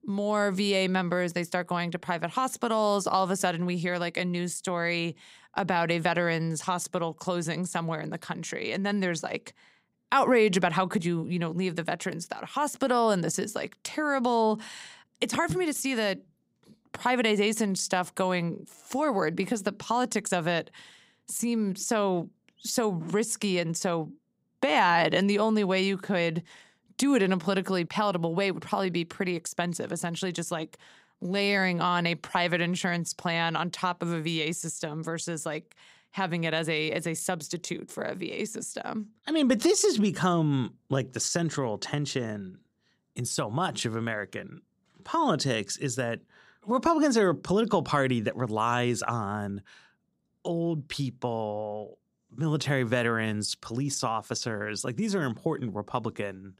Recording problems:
none

